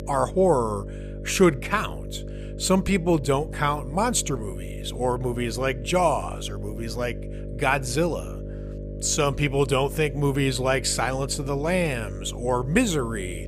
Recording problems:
electrical hum; noticeable; throughout; 50 Hz, 15 dB below the speech

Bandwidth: 14.5 kHz